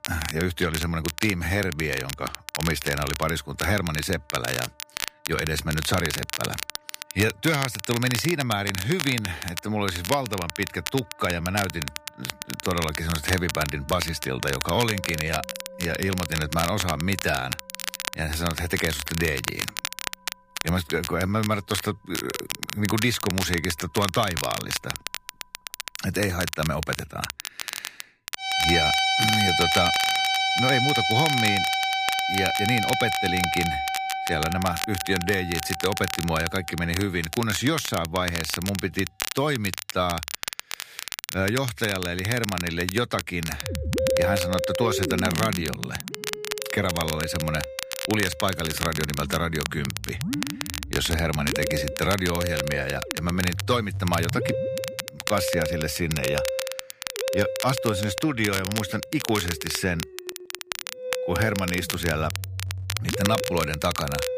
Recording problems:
background music; loud; throughout; 1 dB below the speech
crackle, like an old record; loud; 5 dB below the speech

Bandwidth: 15 kHz